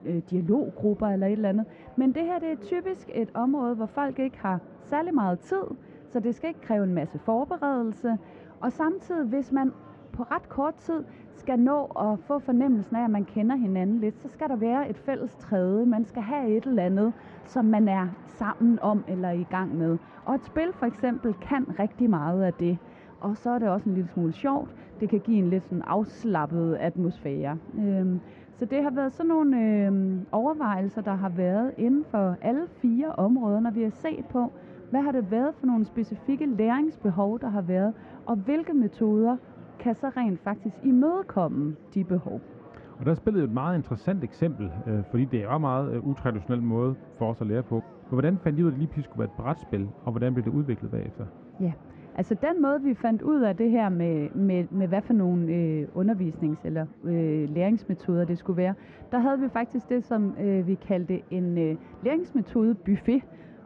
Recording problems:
muffled; very; fading above 1.5 kHz
murmuring crowd; faint; throughout; 20 dB below the speech

